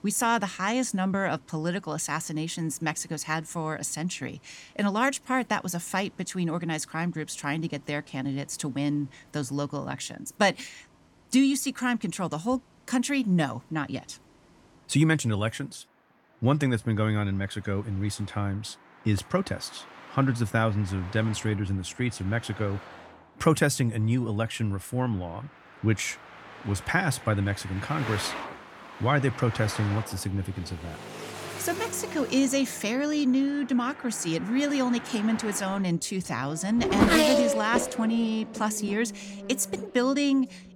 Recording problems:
traffic noise; loud; throughout; 6 dB below the speech

